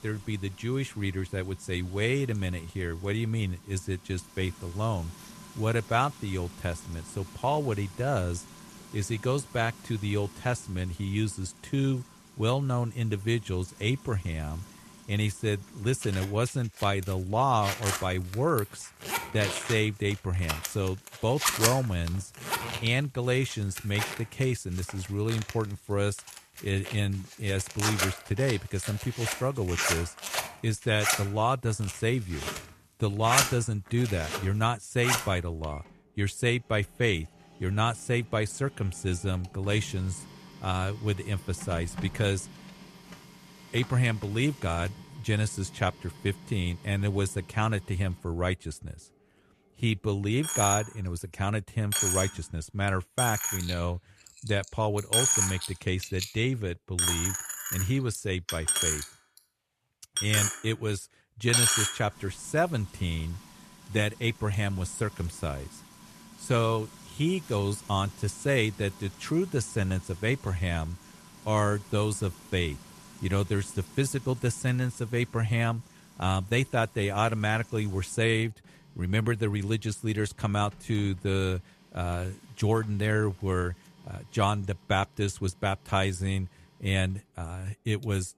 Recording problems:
household noises; loud; throughout; 1 dB below the speech

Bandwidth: 13.5 kHz